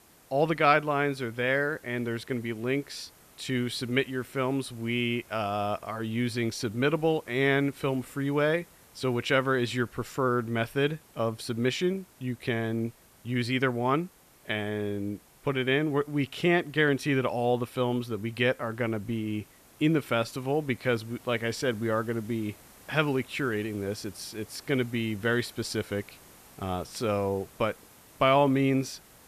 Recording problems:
hiss; faint; throughout; 25 dB below the speech

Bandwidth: 14.5 kHz